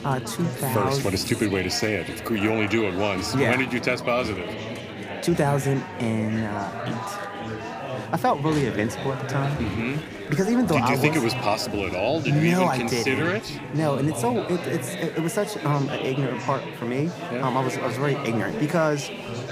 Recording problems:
chatter from many people; loud; throughout; 7 dB below the speech

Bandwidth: 15 kHz